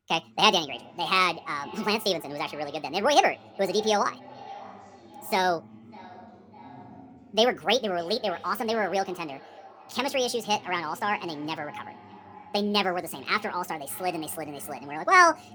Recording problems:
wrong speed and pitch; too fast and too high; 1.5 times normal speed
echo of what is said; faint; throughout; 600 ms later, 20 dB below the speech
voice in the background; faint; throughout; 25 dB below the speech

